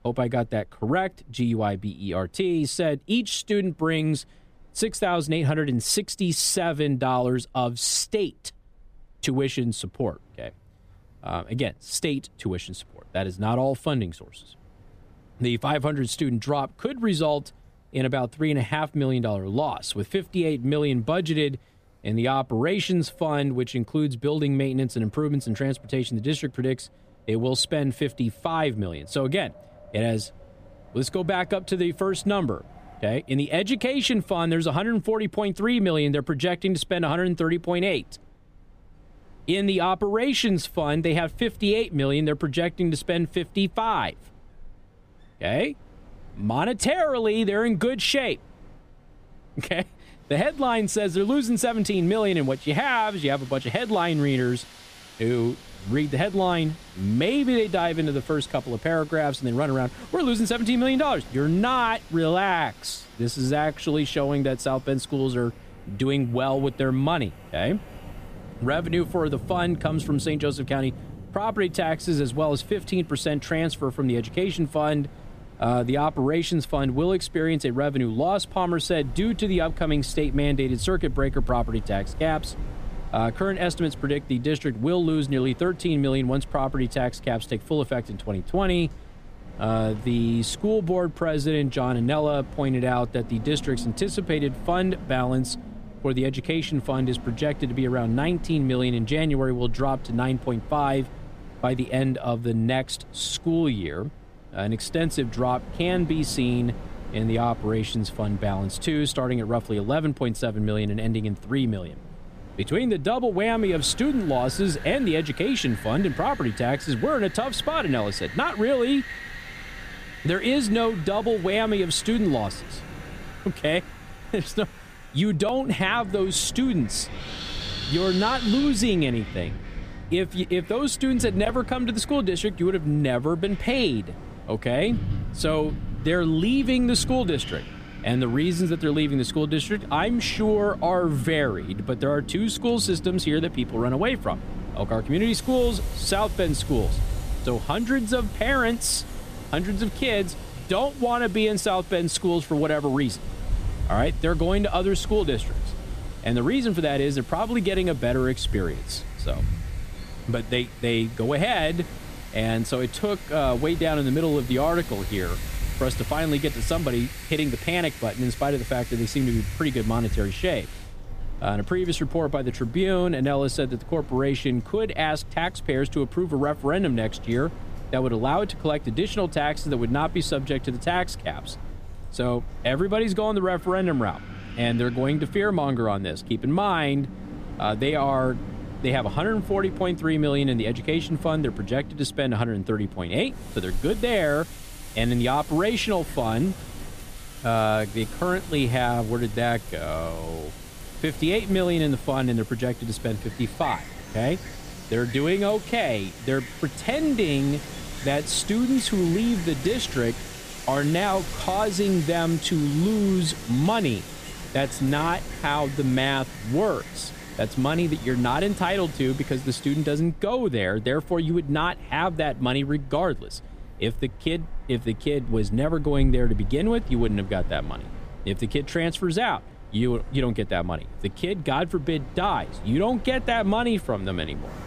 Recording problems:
wind in the background; noticeable; throughout; 15 dB below the speech

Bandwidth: 15 kHz